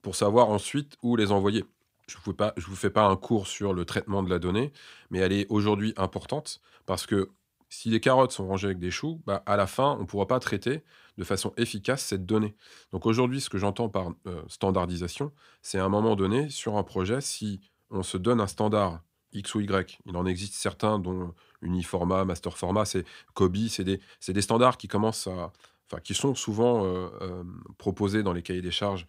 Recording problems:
none

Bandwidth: 15.5 kHz